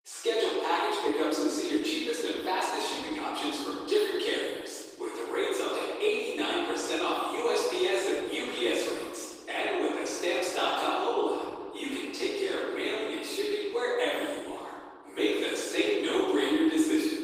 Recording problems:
room echo; strong; dies away in 2 s
off-mic speech; far
thin; somewhat; fading below 300 Hz
garbled, watery; slightly; nothing above 15.5 kHz

